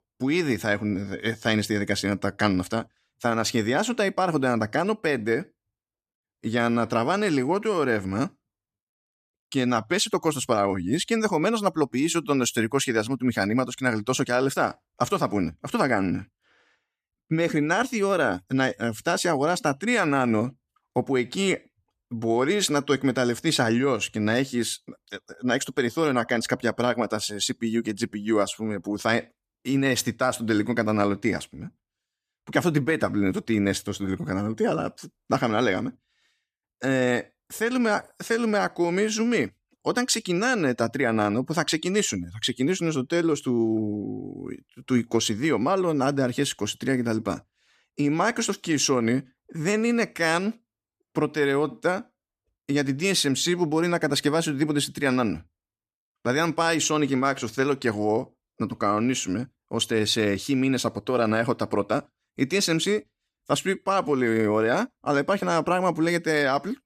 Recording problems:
none

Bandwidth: 14.5 kHz